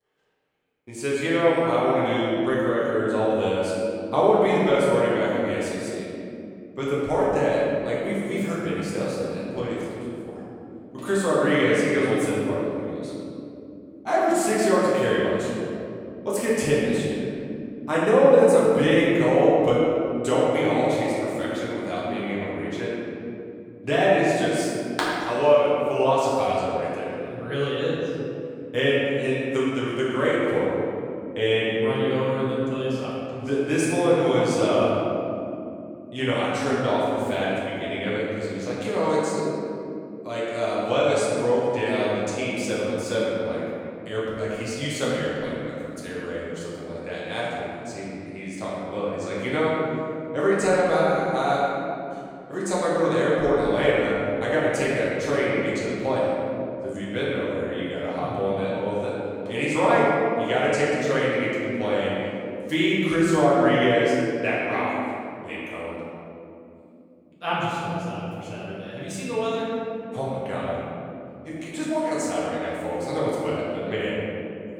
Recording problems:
room echo; strong; dies away in 3 s
off-mic speech; far

